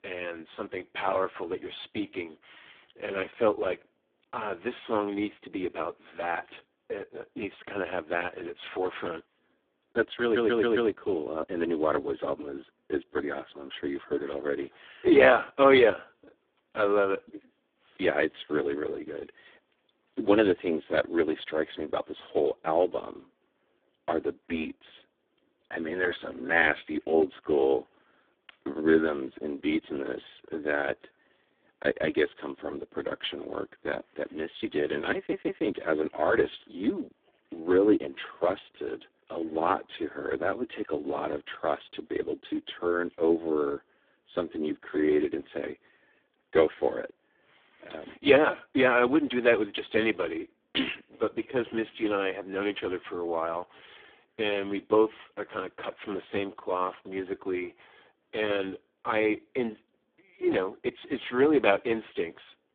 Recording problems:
phone-call audio; poor line
audio stuttering; at 10 s and at 35 s

